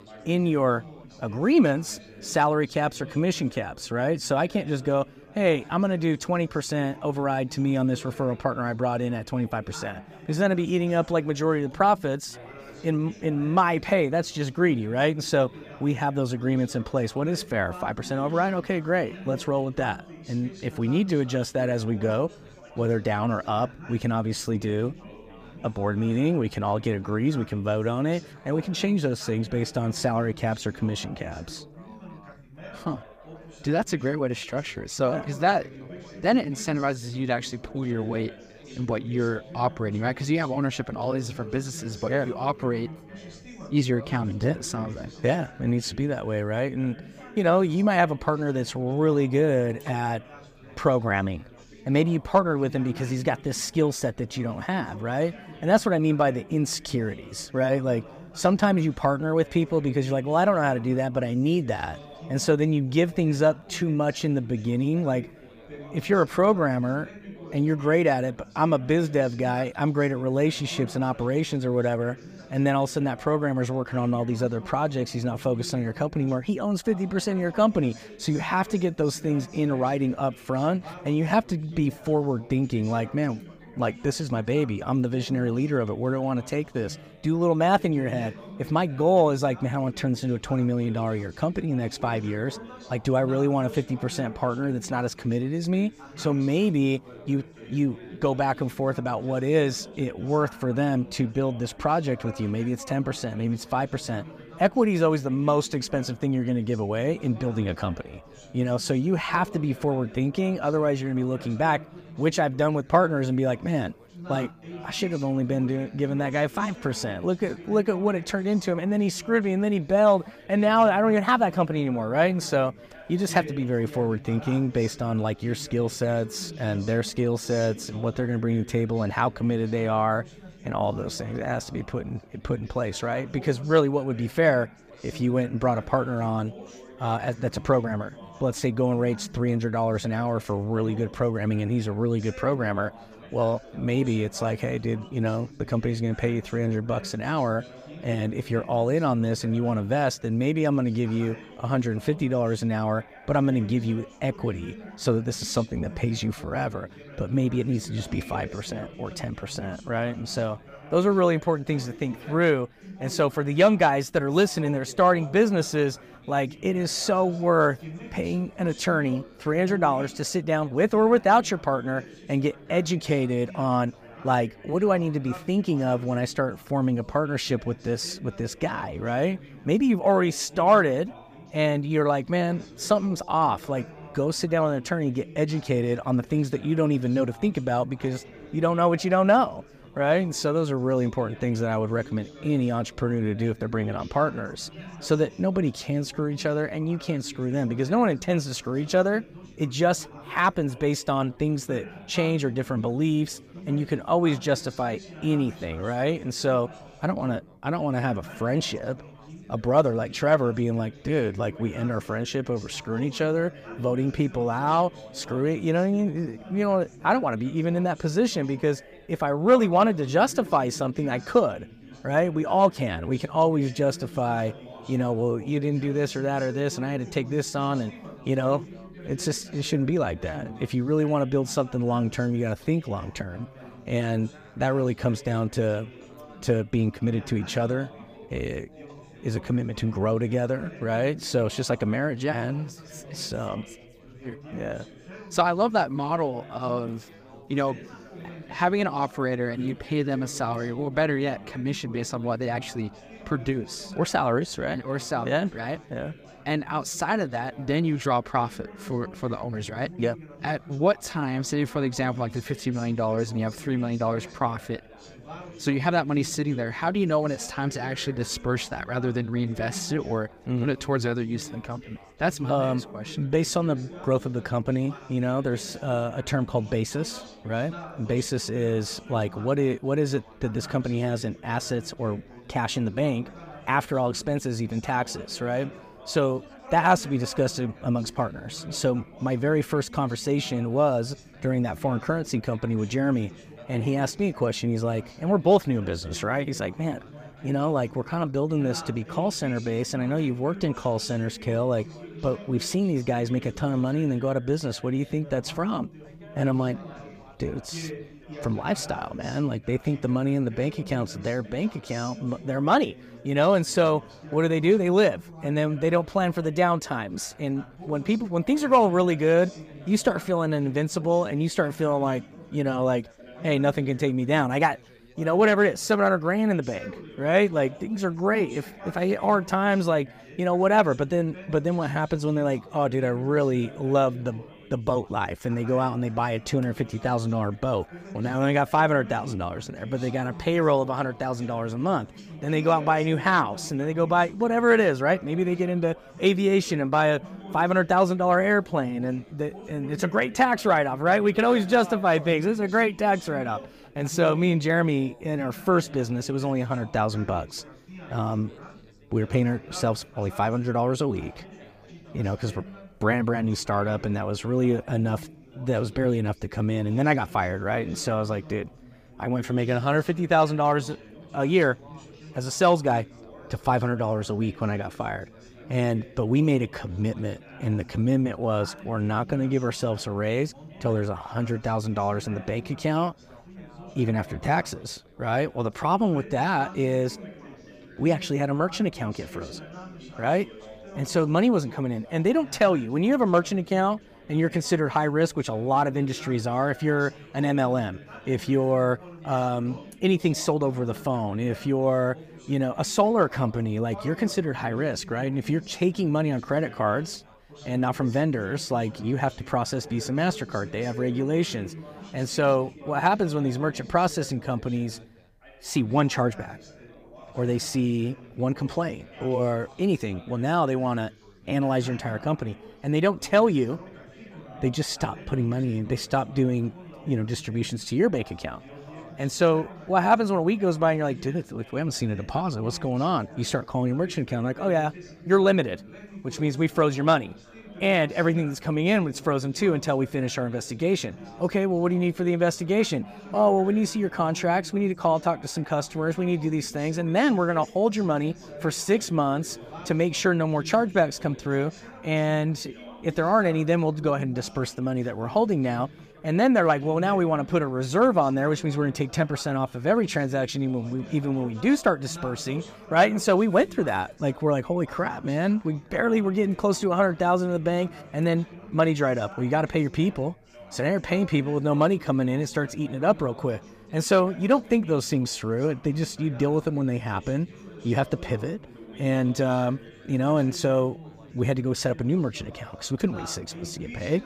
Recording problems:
background chatter; noticeable; throughout; 4 voices, 20 dB below the speech

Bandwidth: 15 kHz